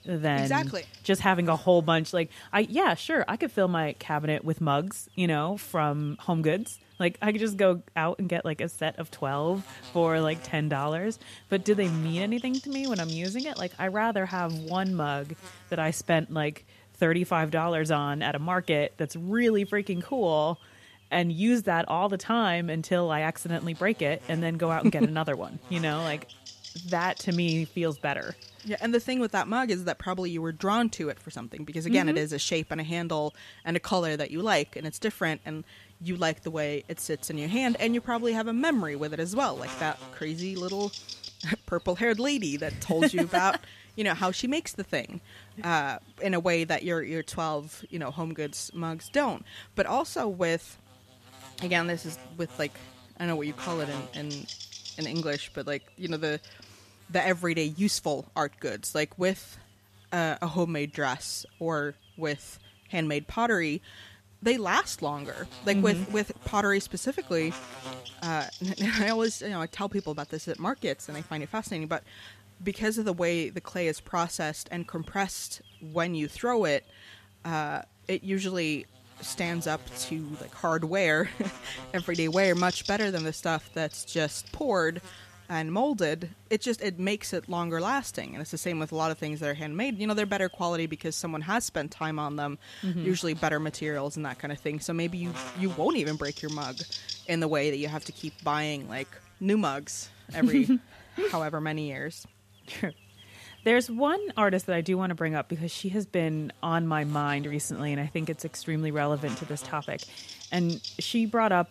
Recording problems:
electrical hum; noticeable; throughout; 50 Hz, 15 dB below the speech

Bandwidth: 14.5 kHz